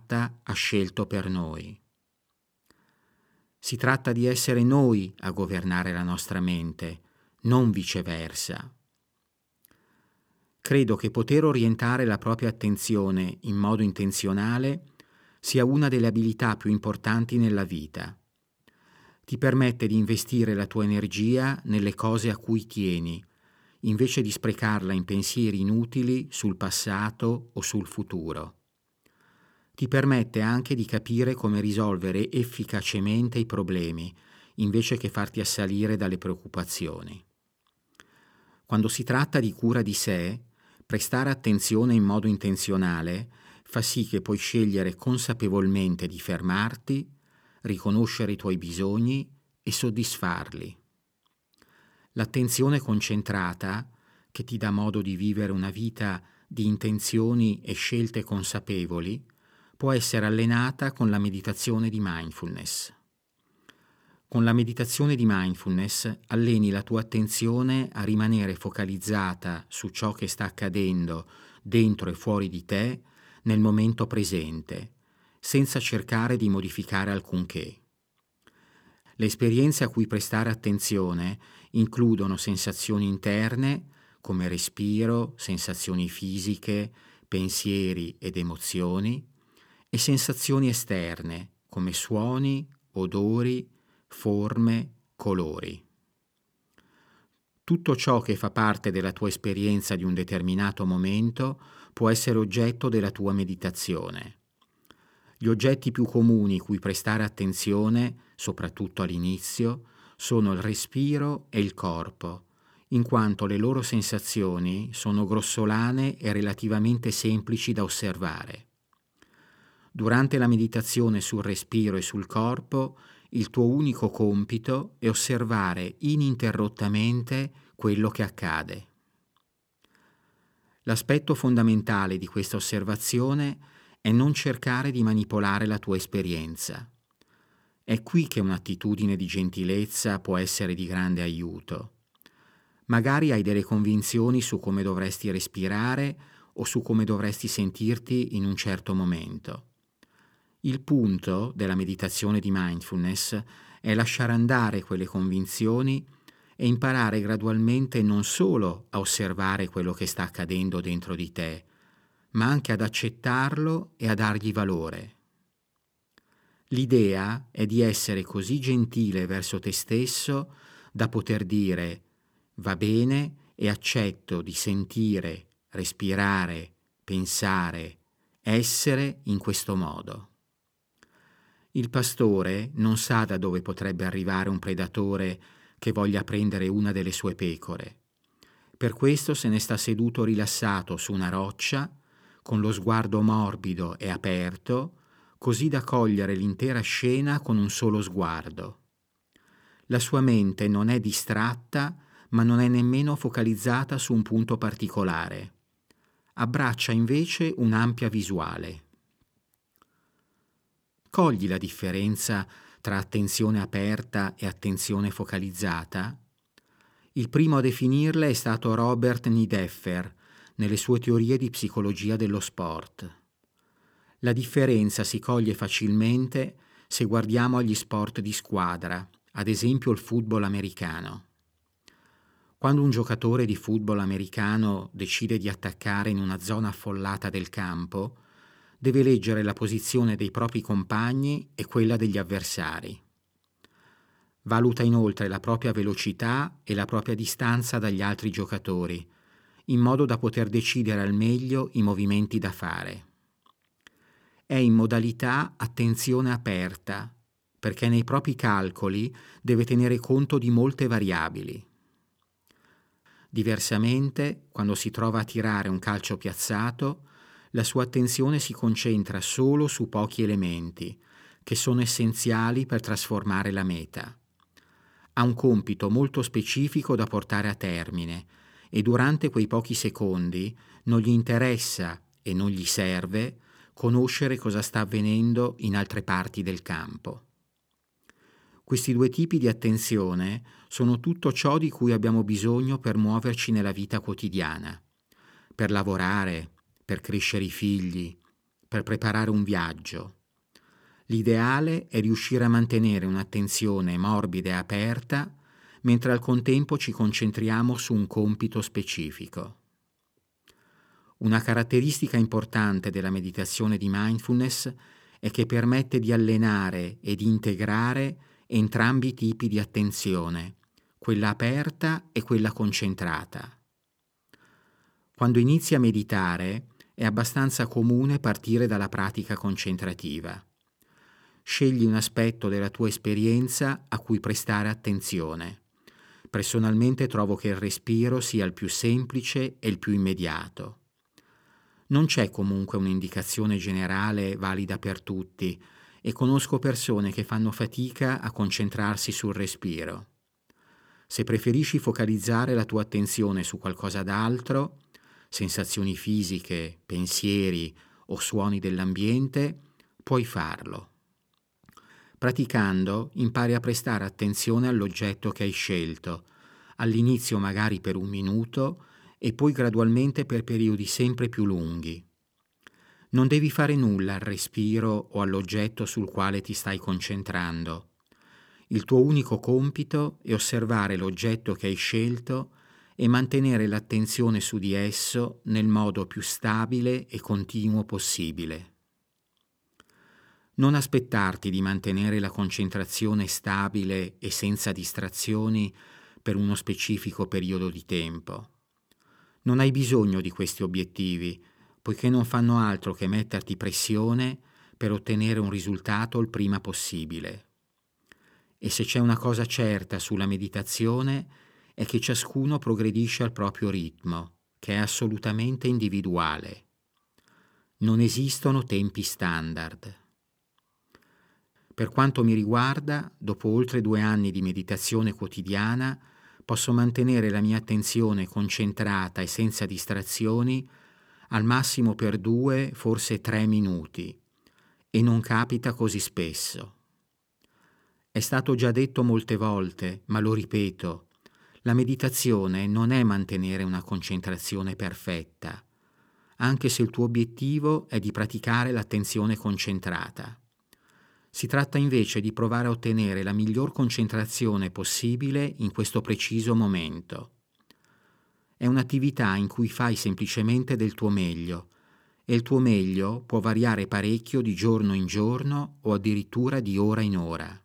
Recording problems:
none

